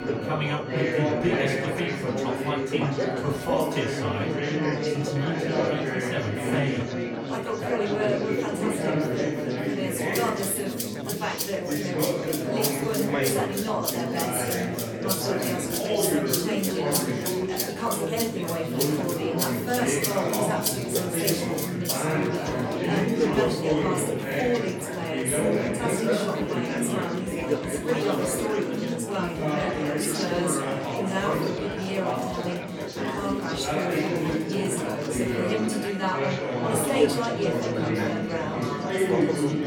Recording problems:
off-mic speech; far
room echo; slight; dies away in 0.4 s
chatter from many people; very loud; throughout; 3 dB above the speech
background music; loud; throughout; 5 dB below the speech

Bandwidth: 17.5 kHz